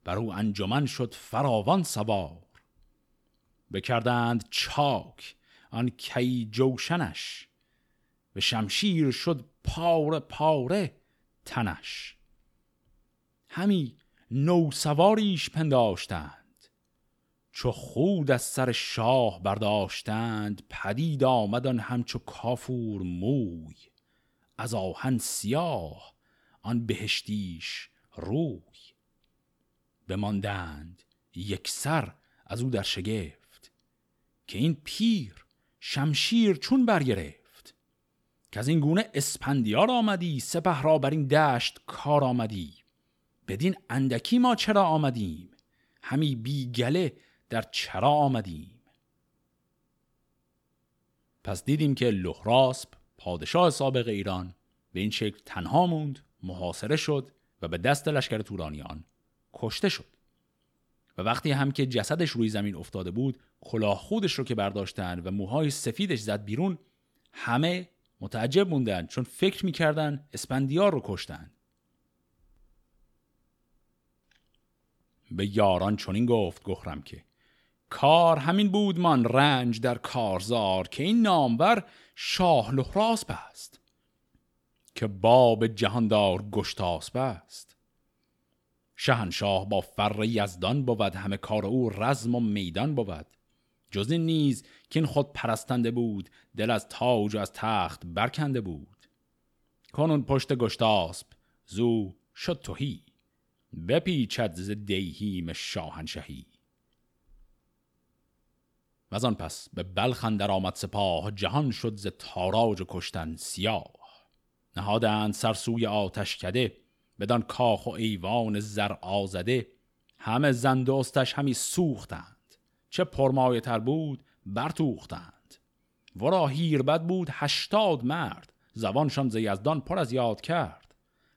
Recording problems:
none

